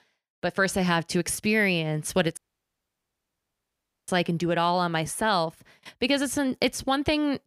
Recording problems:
audio cutting out; at 2.5 s for 1.5 s

